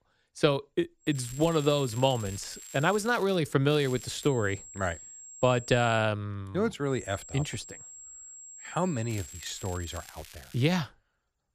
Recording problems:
high-pitched whine; noticeable; from 1 to 3 s, from 4 to 6 s and from 7 to 10 s; 7.5 kHz, 15 dB below the speech
crackling; faint; from 1 to 3.5 s, at 3.5 s and from 9 to 11 s; 20 dB below the speech

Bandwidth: 14.5 kHz